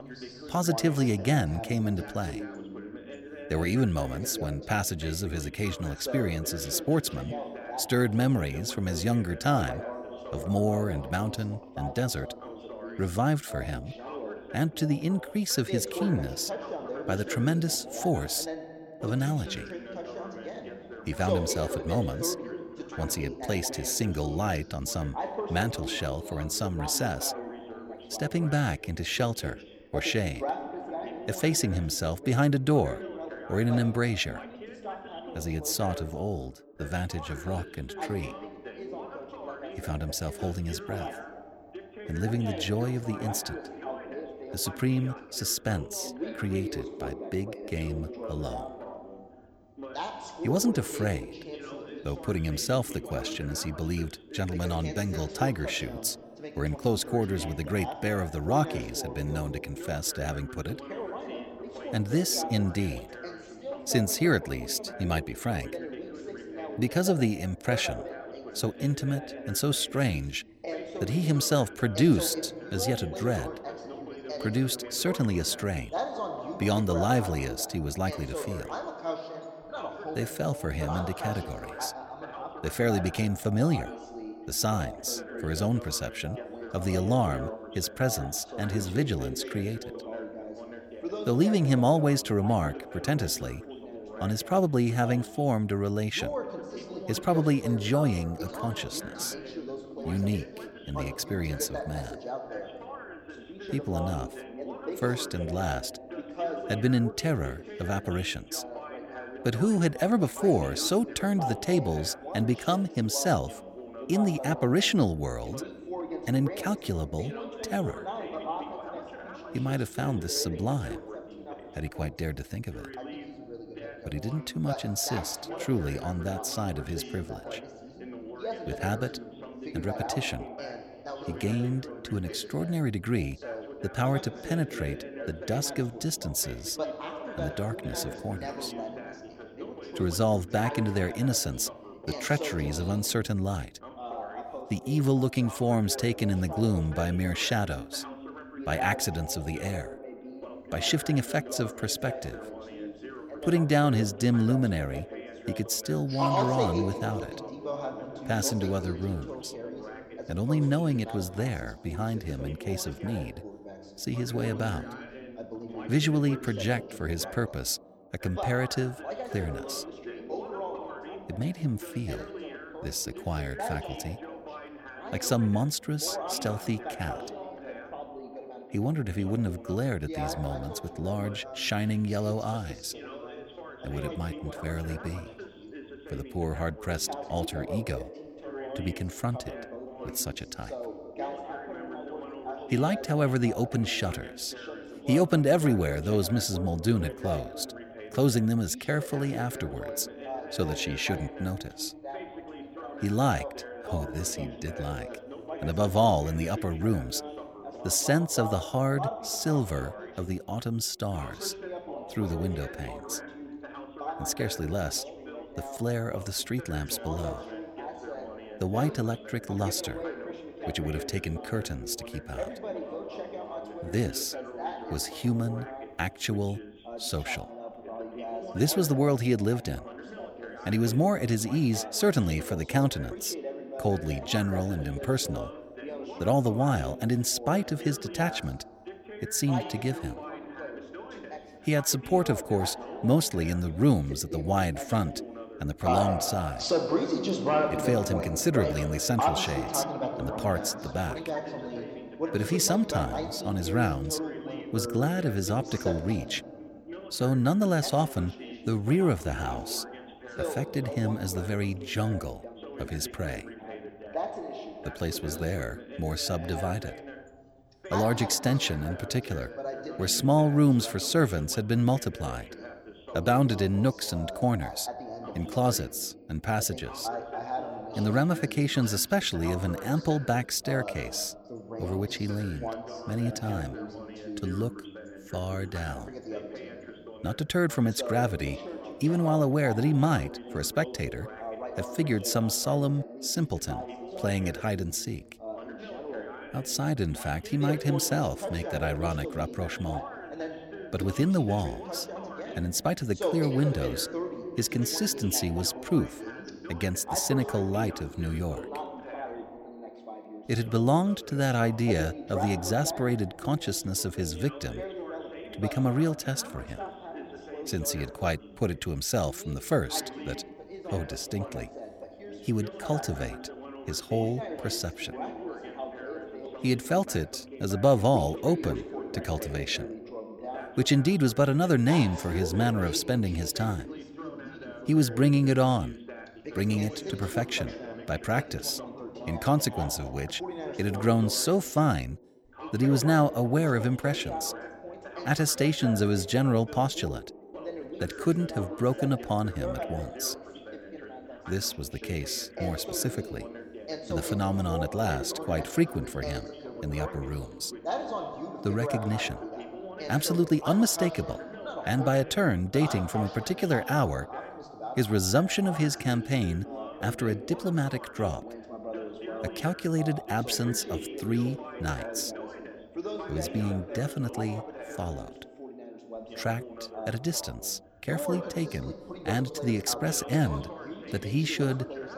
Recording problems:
background chatter; loud; throughout; 2 voices, 9 dB below the speech

